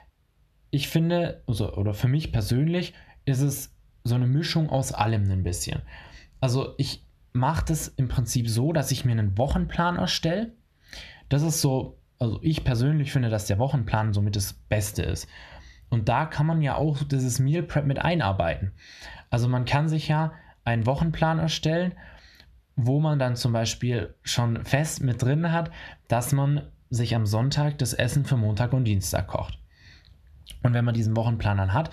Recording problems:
squashed, flat; heavily

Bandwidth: 14 kHz